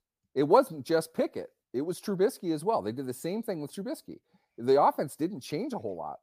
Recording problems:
none

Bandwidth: 15 kHz